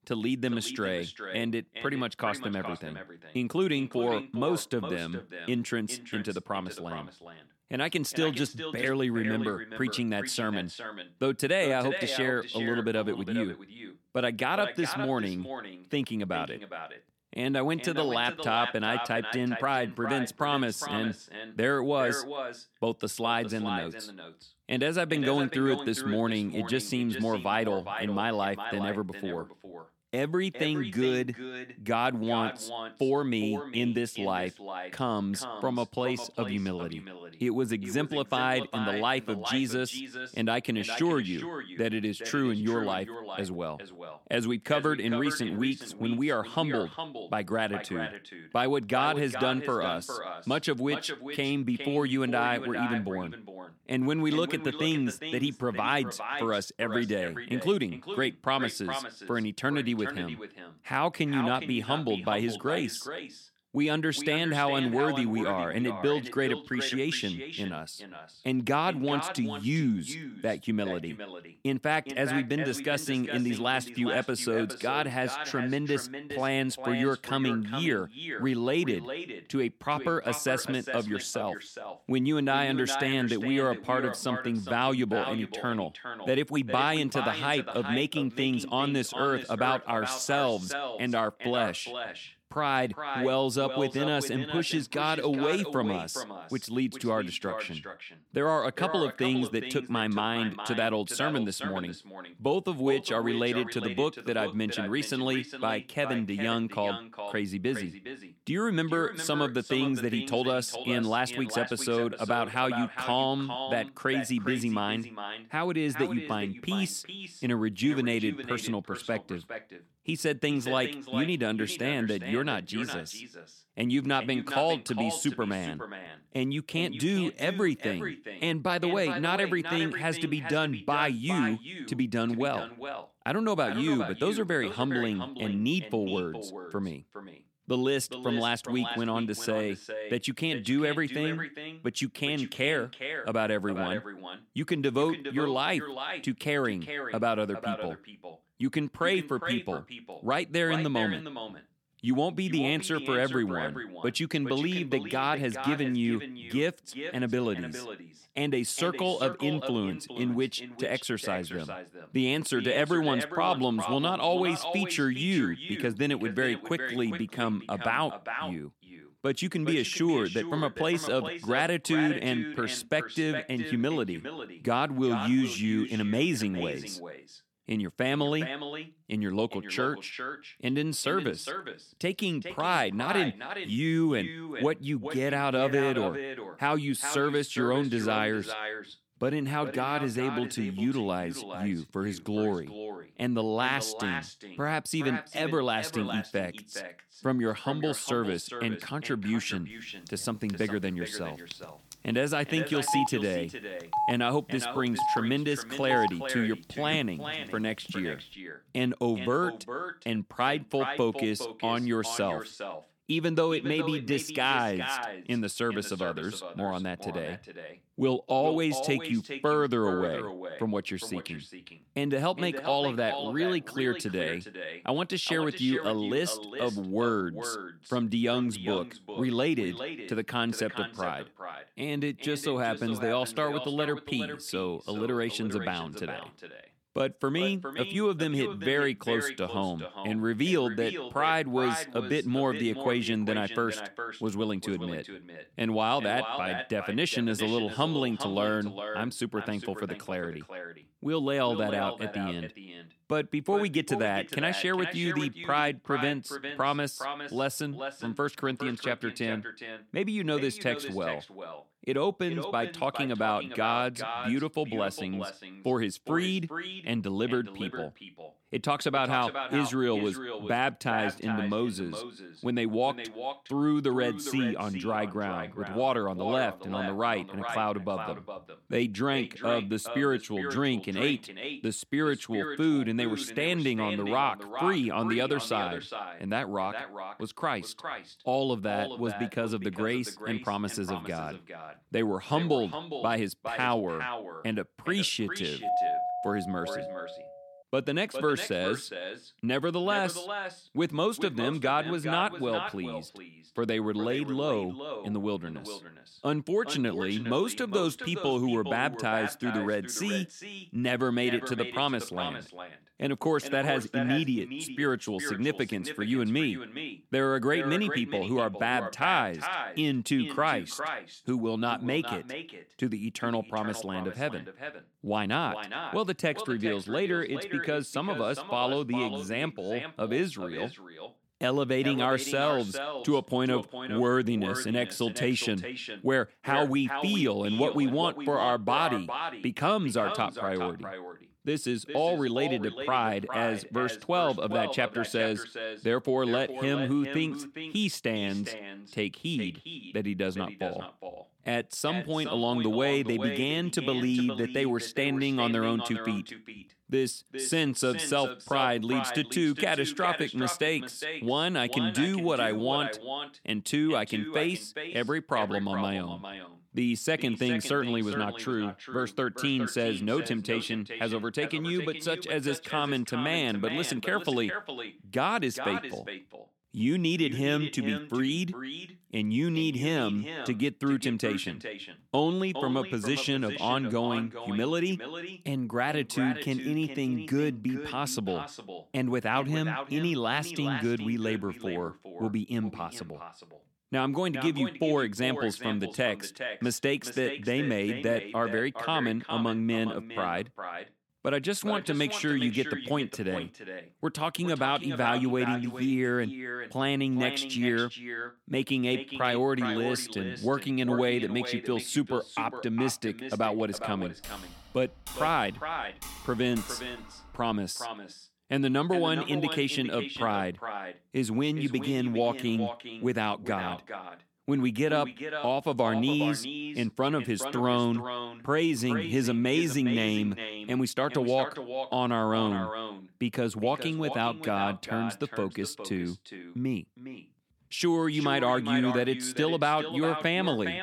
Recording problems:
echo of what is said; strong; throughout; 410 ms later, 9 dB below the speech
phone ringing; loud; from 3:20 to 3:28; peak level with the speech
doorbell; loud; from 4:56 to 4:57; peak 2 dB above the speech
keyboard typing; faint; from 6:54 to 6:58; peak 10 dB below the speech

